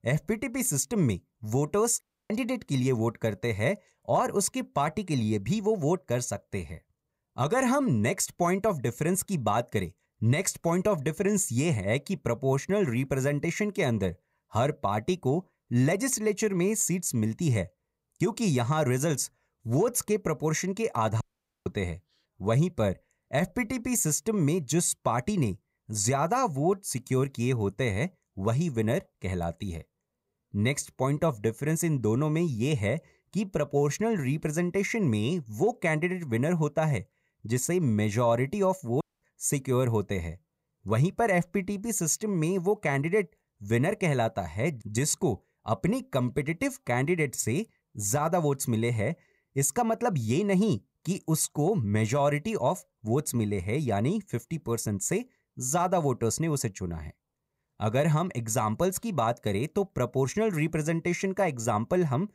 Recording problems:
audio cutting out; at 2 s, at 21 s and at 39 s

